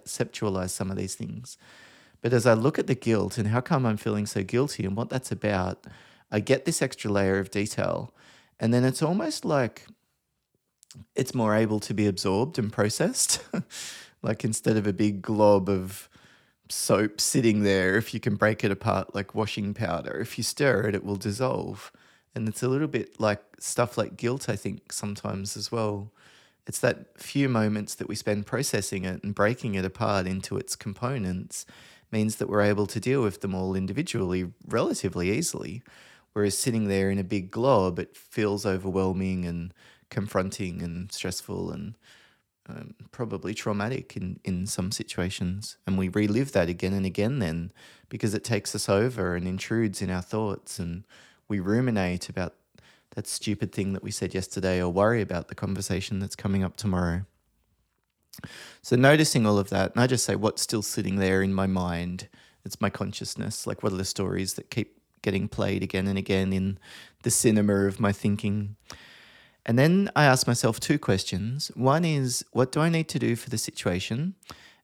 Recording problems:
none

